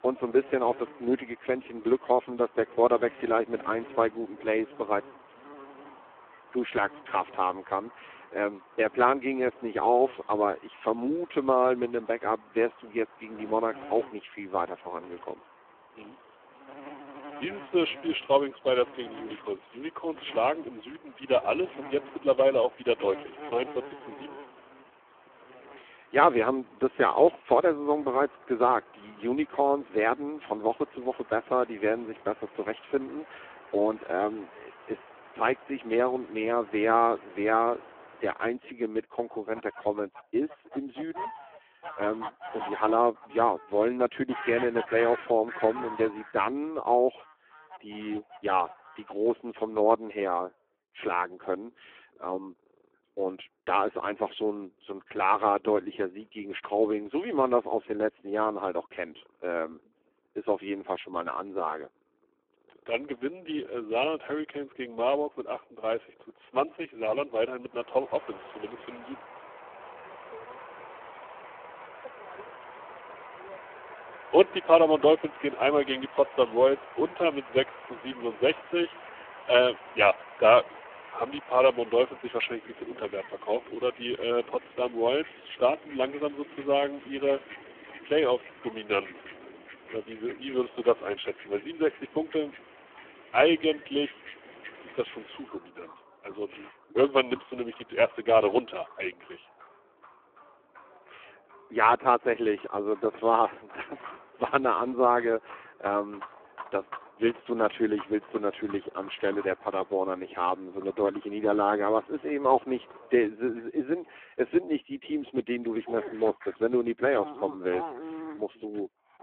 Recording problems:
phone-call audio; poor line
animal sounds; noticeable; throughout; 20 dB below the speech

